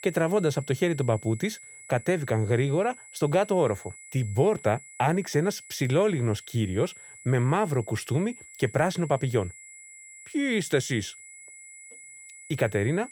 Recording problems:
high-pitched whine; noticeable; throughout; 2 kHz, 20 dB below the speech

